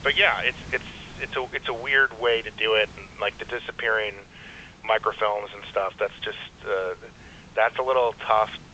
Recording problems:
thin; very; fading below 450 Hz
phone-call audio; nothing above 3.5 kHz
hiss; faint; throughout; 20 dB below the speech

